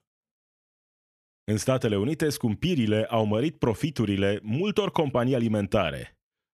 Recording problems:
none

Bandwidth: 14.5 kHz